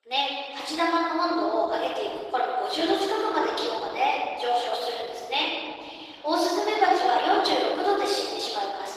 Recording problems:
off-mic speech; far
thin; very; fading below 300 Hz
room echo; noticeable; dies away in 2 s
garbled, watery; slightly; nothing above 15 kHz

